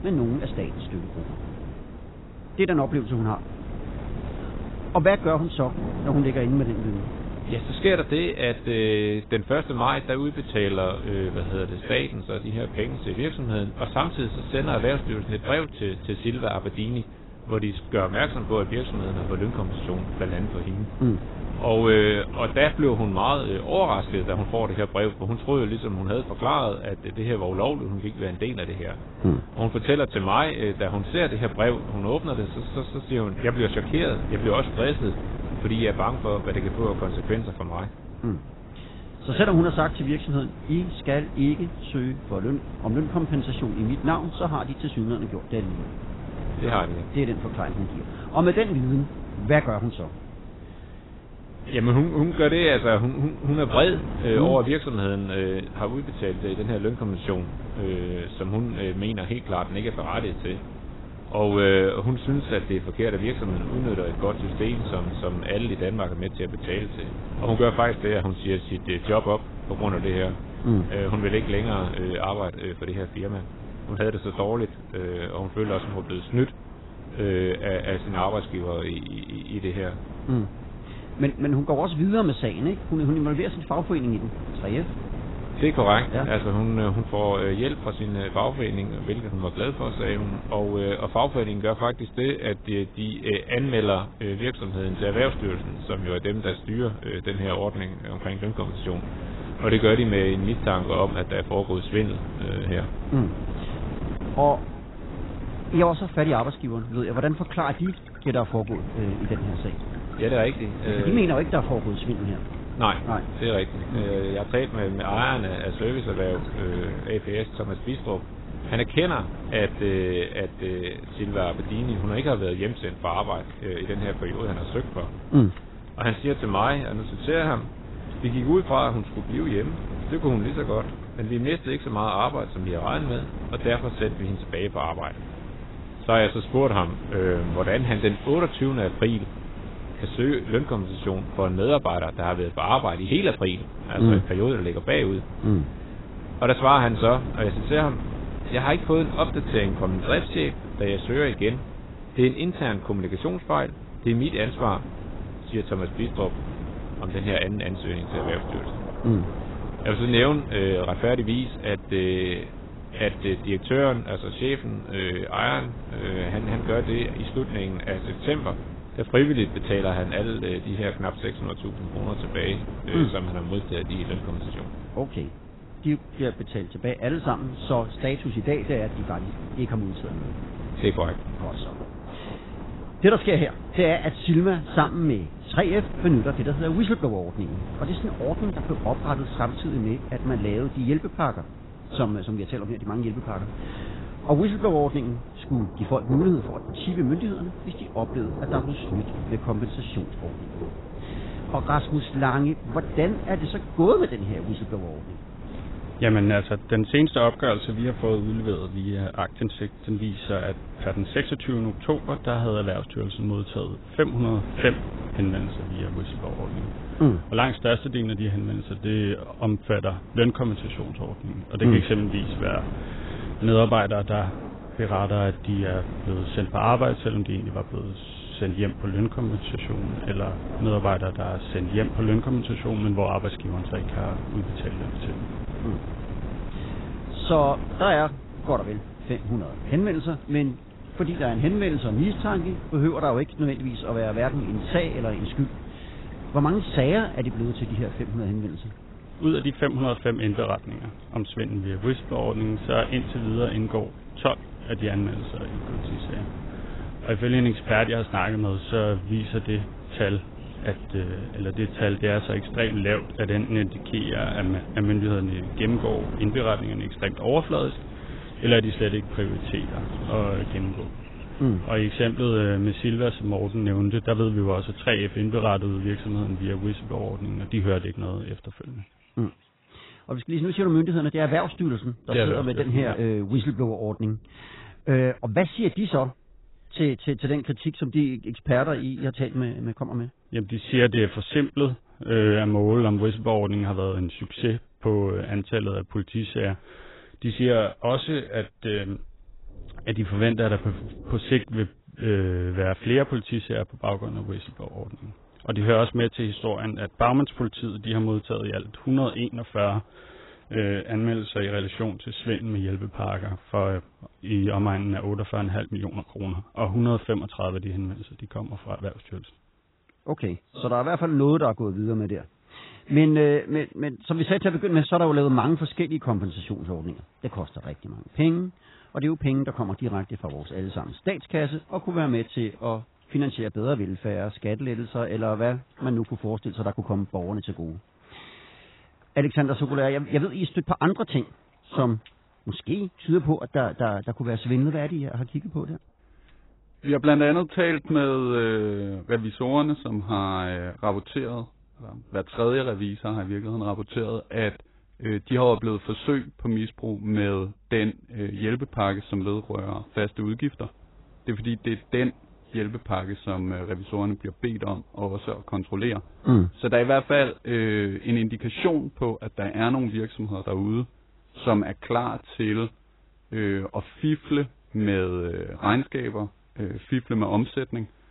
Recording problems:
garbled, watery; badly; nothing above 4 kHz
wind noise on the microphone; occasional gusts; until 4:38; 15 dB below the speech
rain or running water; faint; throughout; 20 dB below the speech

